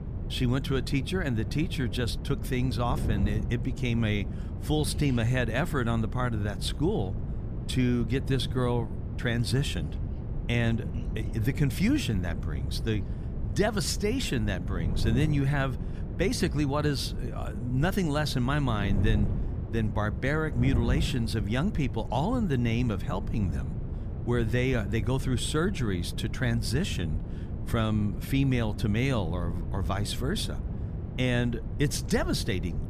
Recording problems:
wind noise on the microphone; occasional gusts; 10 dB below the speech

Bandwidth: 14.5 kHz